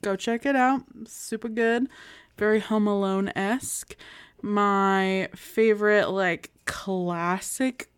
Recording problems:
none

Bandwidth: 18.5 kHz